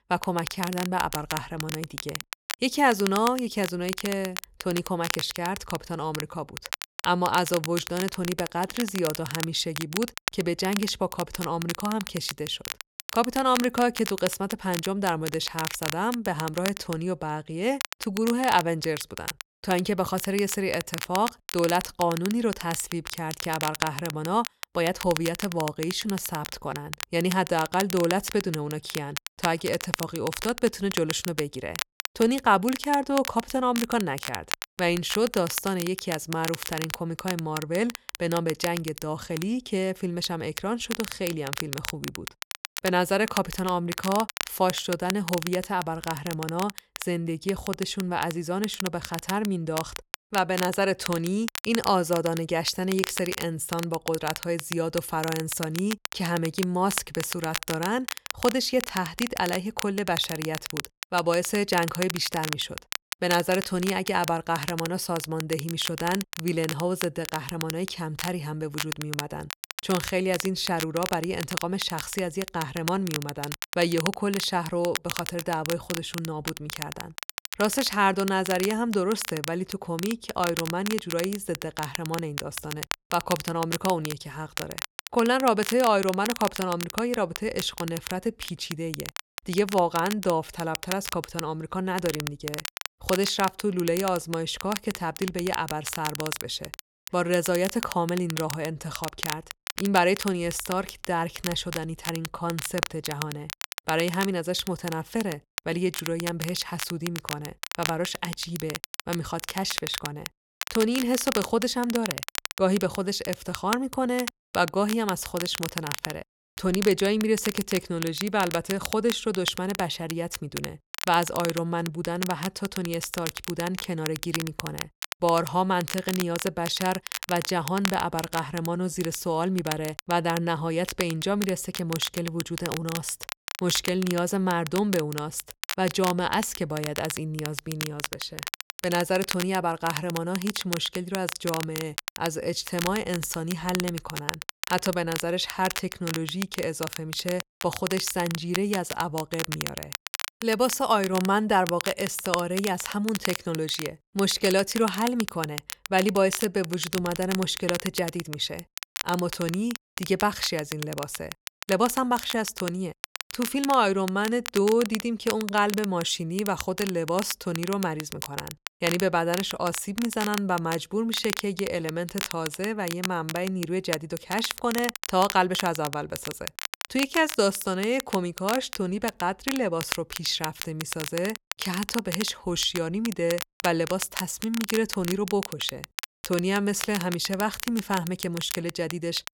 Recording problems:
crackle, like an old record; loud; 7 dB below the speech

